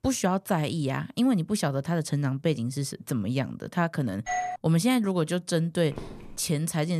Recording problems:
doorbell; noticeable; at 4.5 s; peak 3 dB below the speech
footsteps; faint; at 6 s; peak 15 dB below the speech
abrupt cut into speech; at the end

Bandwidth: 14.5 kHz